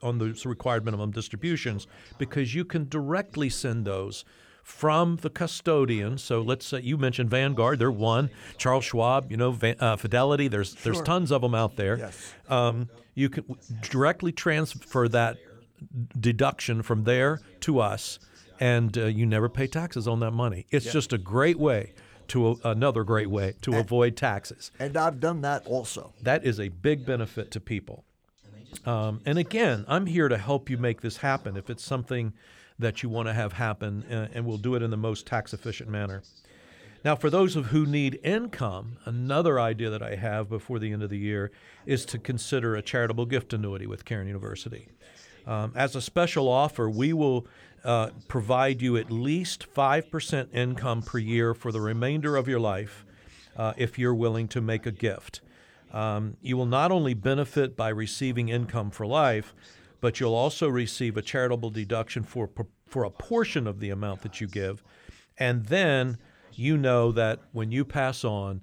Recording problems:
voice in the background; faint; throughout; 30 dB below the speech

